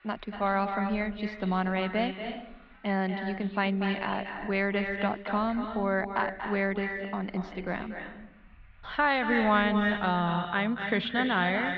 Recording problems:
echo of what is said; strong; throughout; 240 ms later, 6 dB below the speech
muffled; slightly; fading above 4 kHz
traffic noise; faint; throughout; 25 dB below the speech

